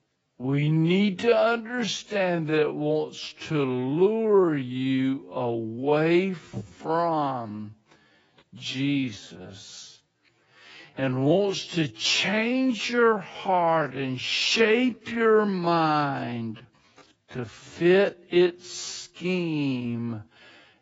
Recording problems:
garbled, watery; badly; nothing above 7.5 kHz
wrong speed, natural pitch; too slow; 0.5 times normal speed

